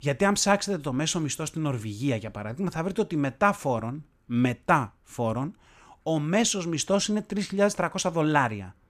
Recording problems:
none

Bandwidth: 14.5 kHz